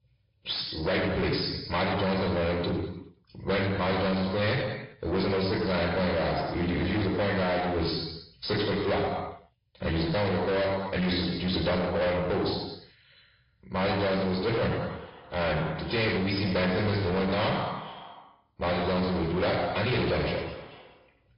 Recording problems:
distortion; heavy; 6 dB below the speech
off-mic speech; far
room echo; noticeable; dies away in 0.9 s
high frequencies cut off; noticeable; nothing above 5 kHz
echo of what is said; faint; from 14 s on; 420 ms later, 20 dB below the speech
garbled, watery; slightly

